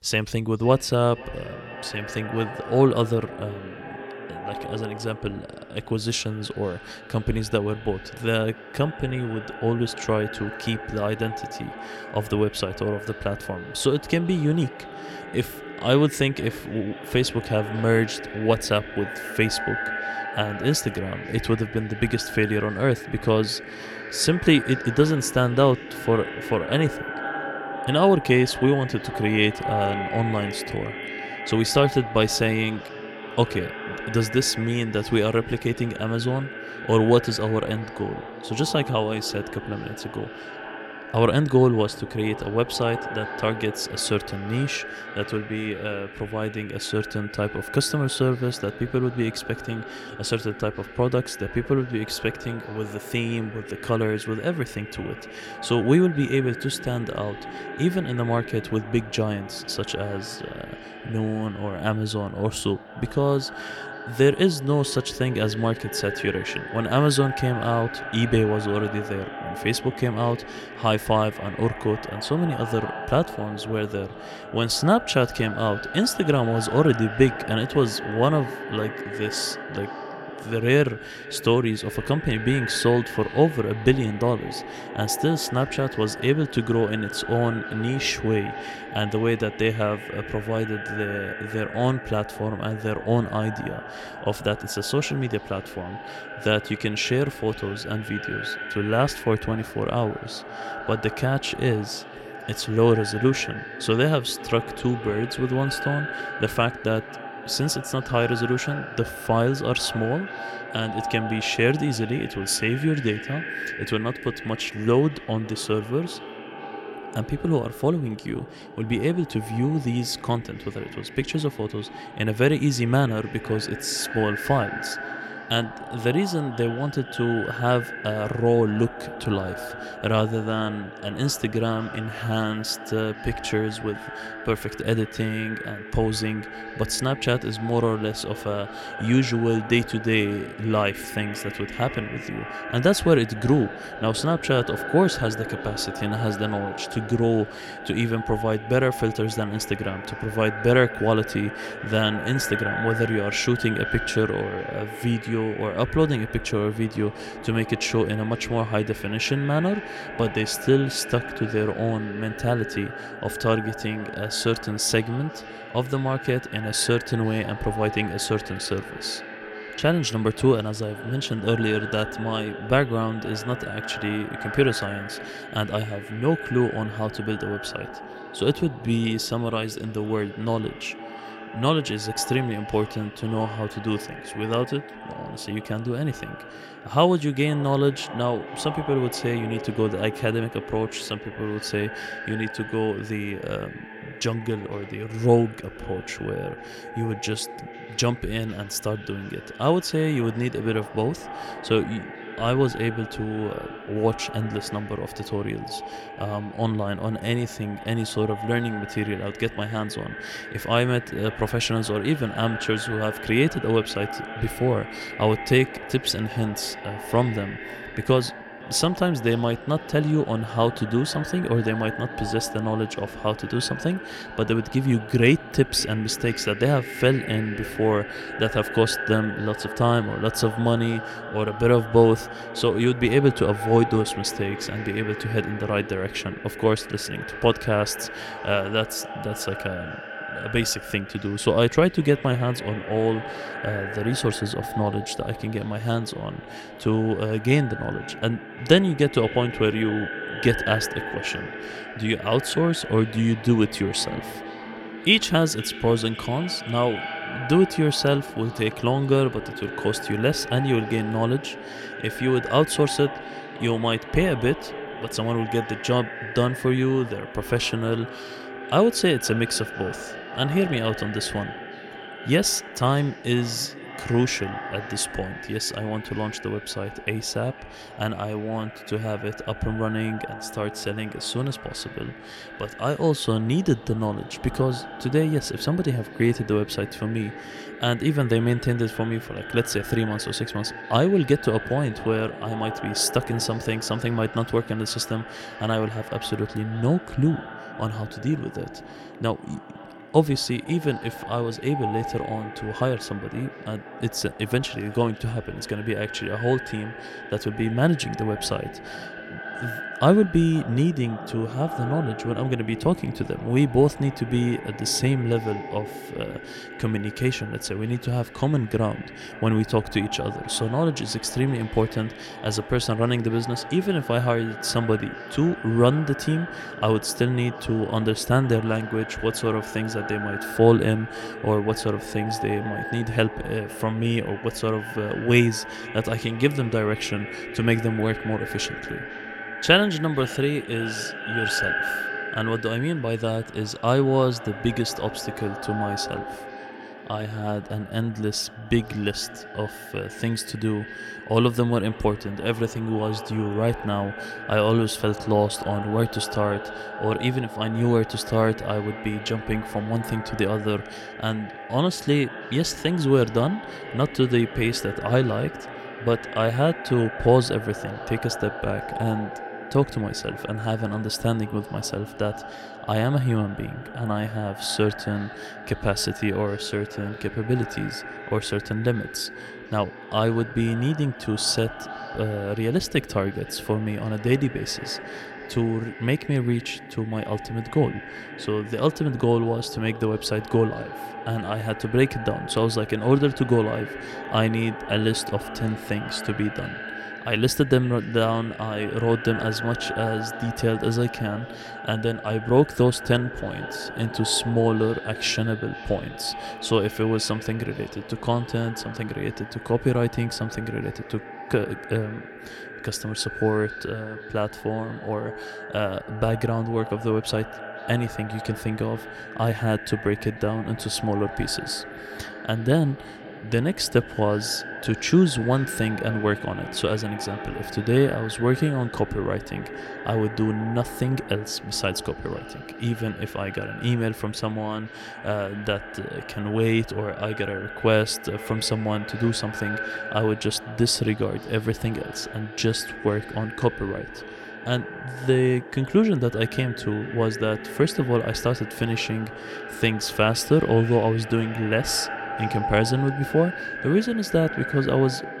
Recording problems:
echo of what is said; strong; throughout; 500 ms later, 10 dB below the speech

